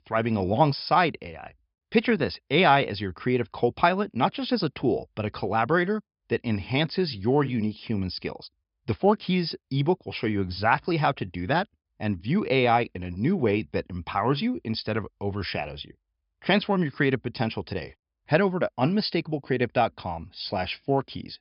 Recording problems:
high frequencies cut off; noticeable; nothing above 5.5 kHz

